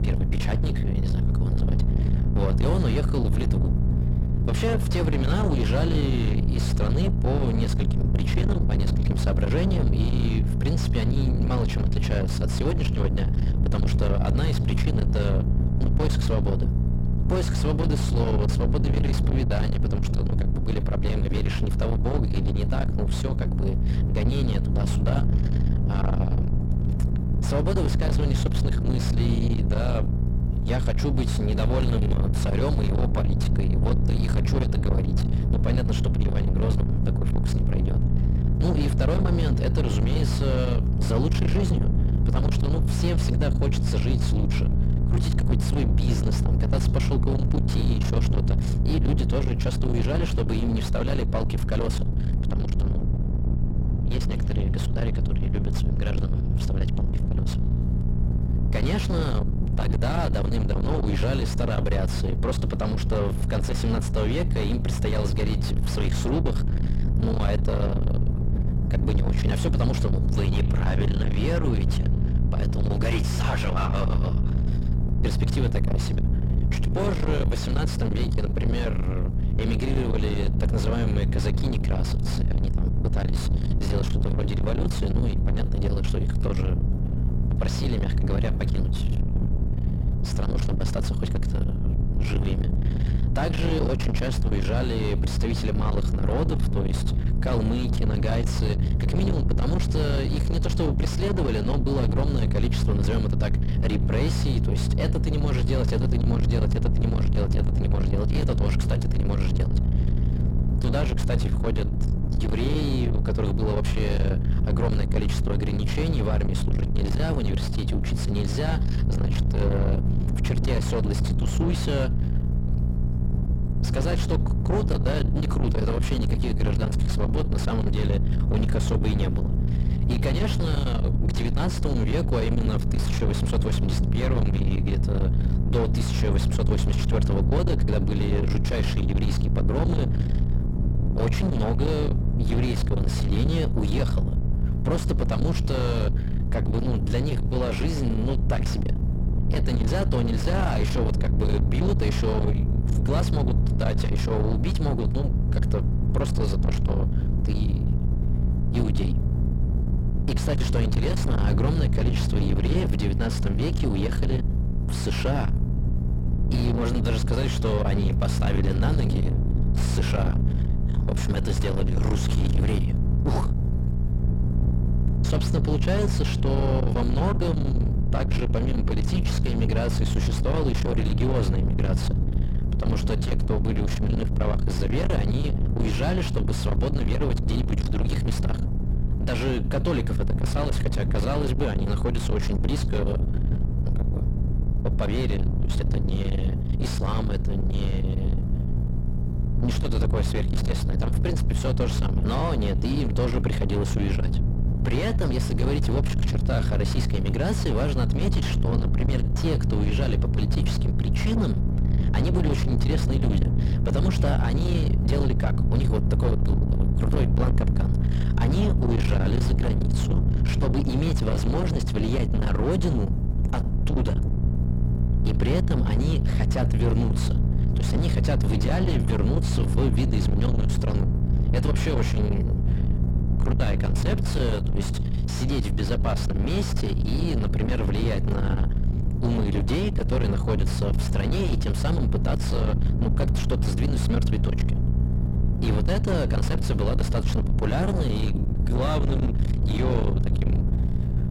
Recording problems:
distortion; heavy; 6 dB below the speech
electrical hum; loud; throughout; 60 Hz, 9 dB below the speech
low rumble; loud; throughout; 6 dB below the speech

